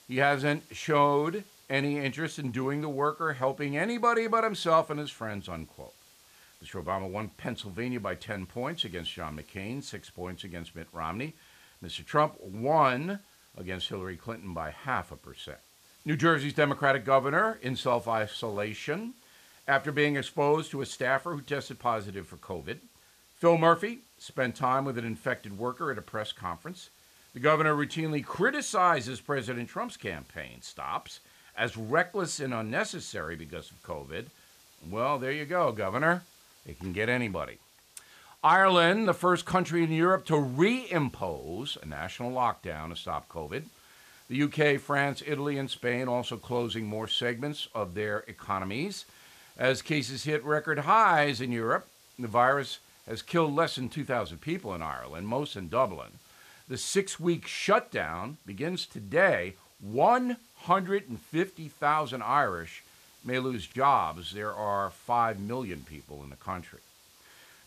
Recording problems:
hiss; faint; throughout; 30 dB below the speech

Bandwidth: 14.5 kHz